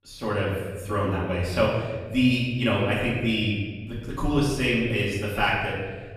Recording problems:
off-mic speech; far
room echo; noticeable; dies away in 1.4 s

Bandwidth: 14.5 kHz